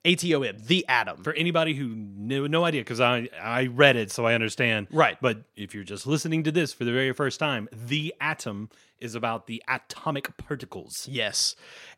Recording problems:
none

